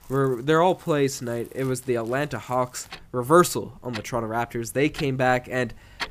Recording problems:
household noises; noticeable; throughout; 20 dB below the speech

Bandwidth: 15 kHz